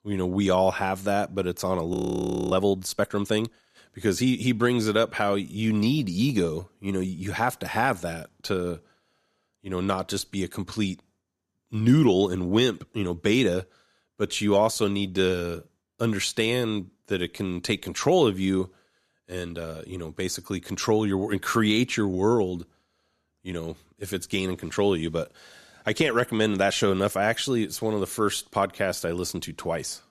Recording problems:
audio freezing; at 2 s for 0.5 s

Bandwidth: 14 kHz